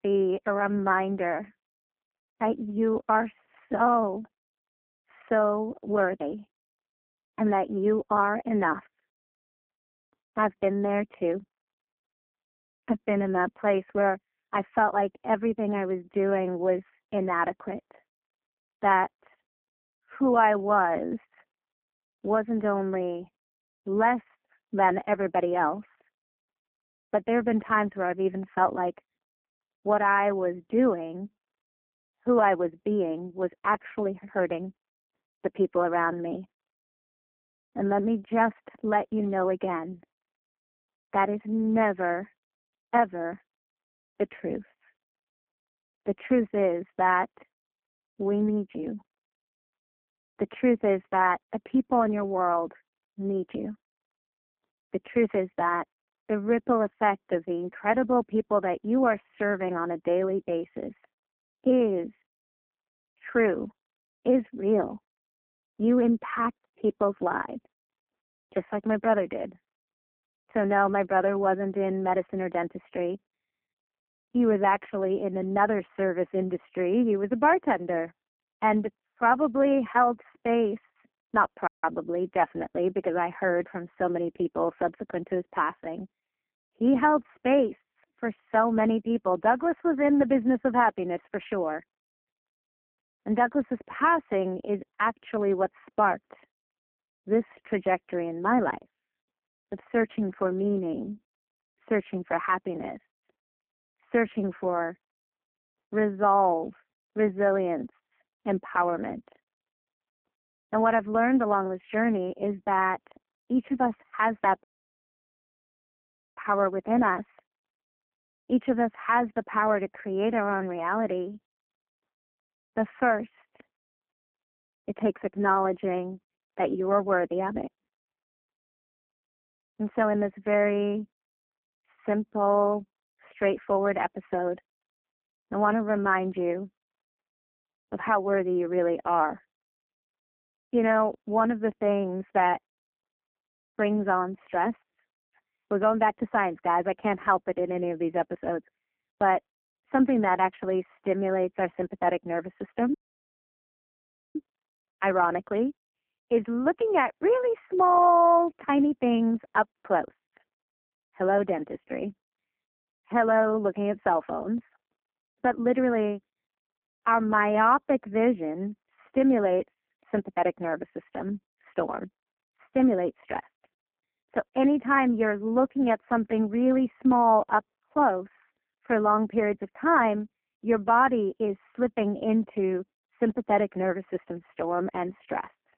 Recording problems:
phone-call audio; poor line
muffled; very; fading above 2 kHz
audio cutting out; at 1:22, at 1:55 for 1.5 s and at 2:33 for 1.5 s

